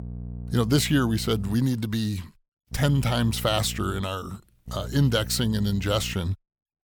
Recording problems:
electrical hum; faint; until 1.5 s, from 2.5 to 4 s and from 4.5 to 6 s; 60 Hz, 20 dB below the speech

